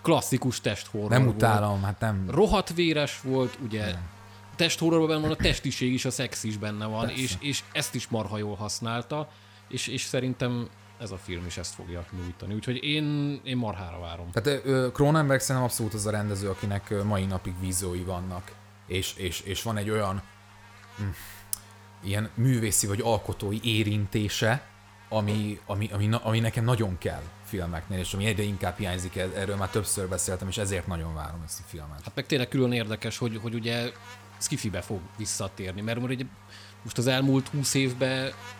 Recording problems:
electrical hum; noticeable; throughout; 50 Hz, 20 dB below the speech

